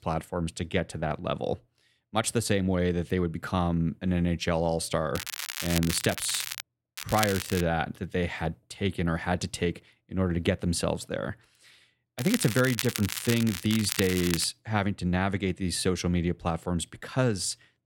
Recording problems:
crackling; loud; from 5 to 6.5 s, at 7 s and from 12 to 14 s; 5 dB below the speech

